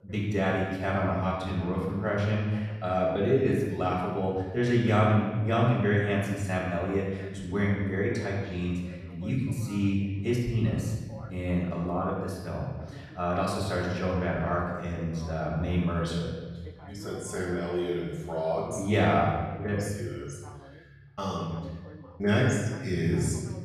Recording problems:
off-mic speech; far
room echo; noticeable; dies away in 1.3 s
voice in the background; faint; throughout; 20 dB below the speech

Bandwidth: 14.5 kHz